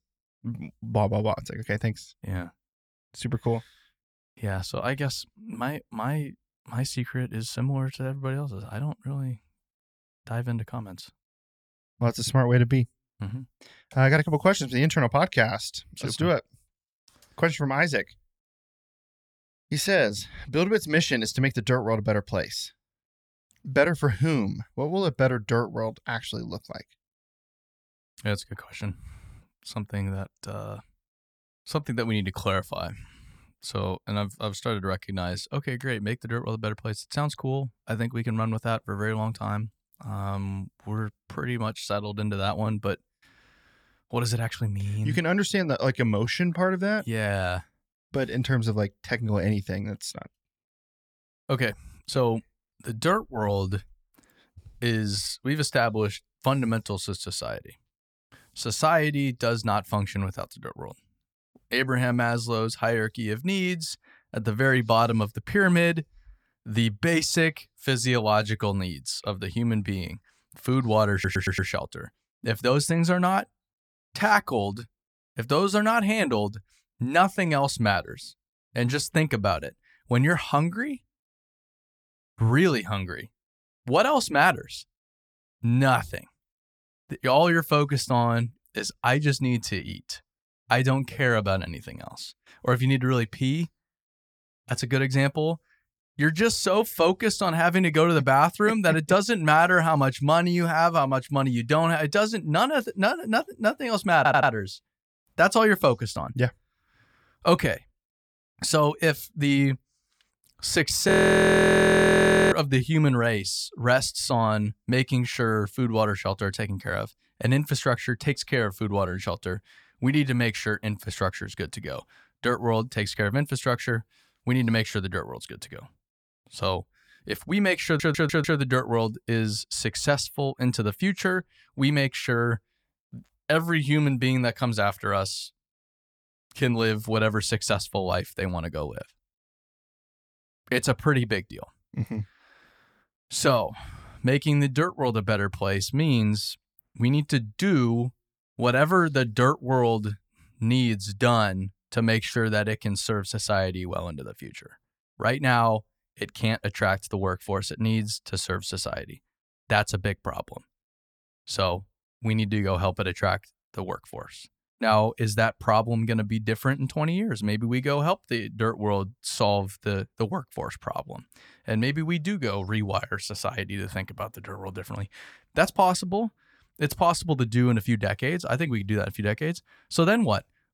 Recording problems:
audio stuttering; at 1:11, at 1:44 and at 2:08
audio freezing; at 1:51 for 1.5 s

